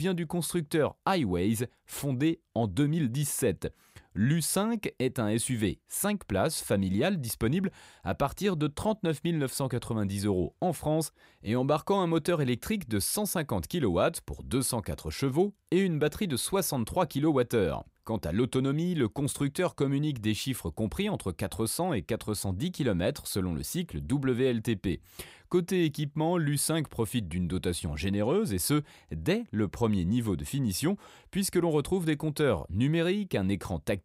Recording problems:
abrupt cut into speech; at the start

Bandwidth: 15.5 kHz